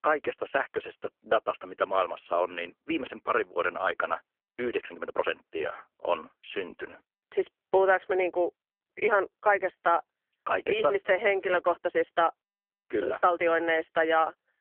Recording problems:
phone-call audio; poor line; nothing above 3 kHz
uneven, jittery; strongly; from 1.5 to 14 s

